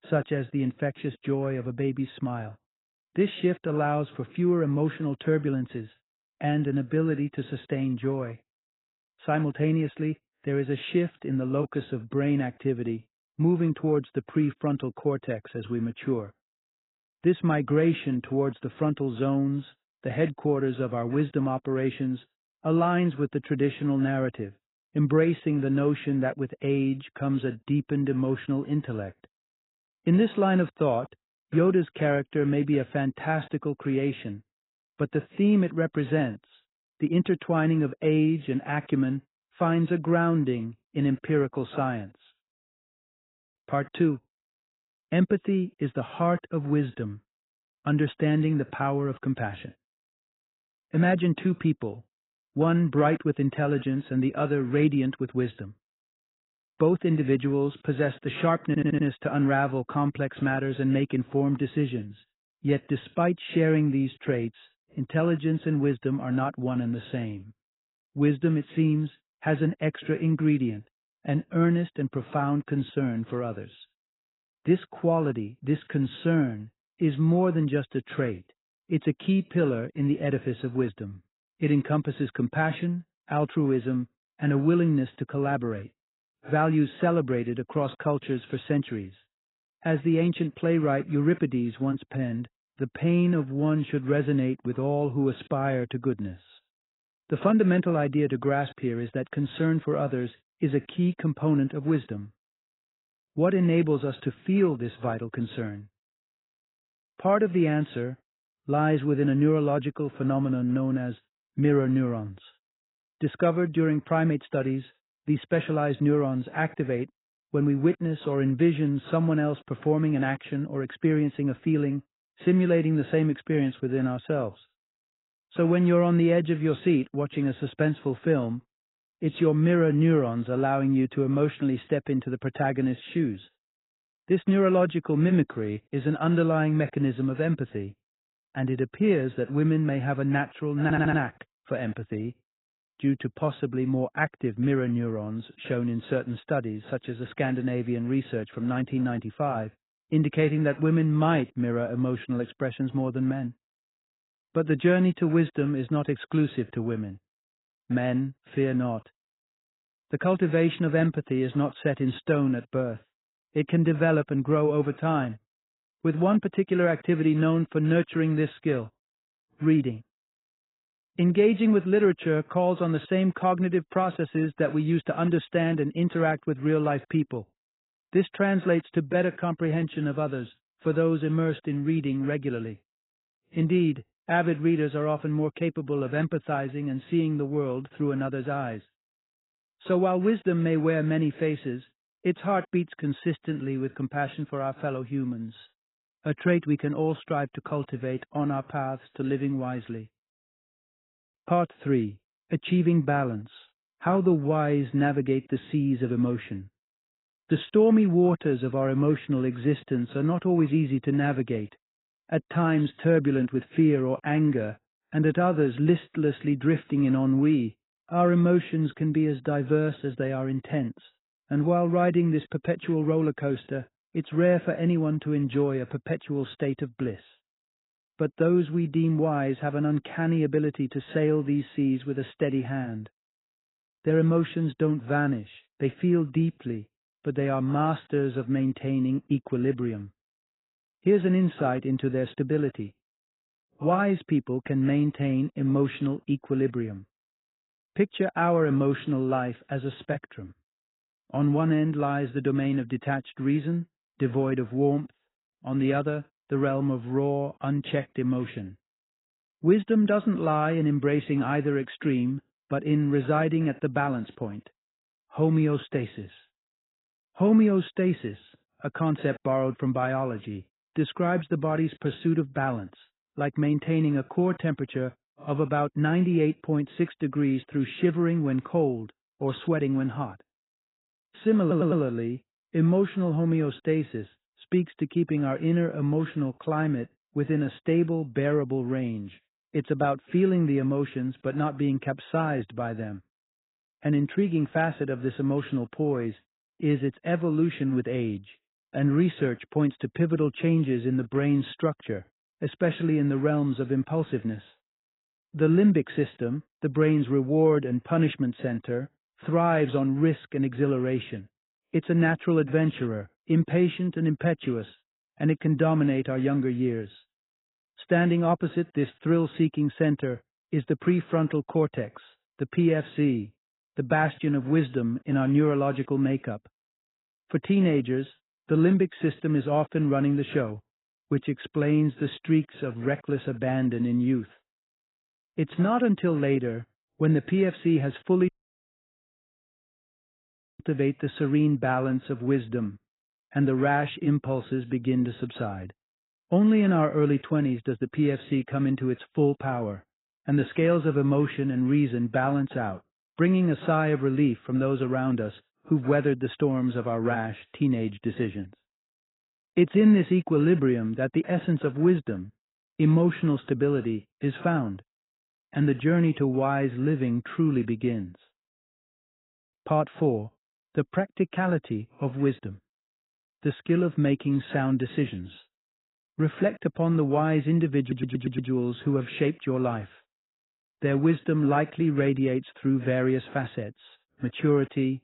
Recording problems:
garbled, watery; badly; nothing above 4 kHz
audio stuttering; 4 times, first at 59 s
audio cutting out; at 5:38 for 2.5 s

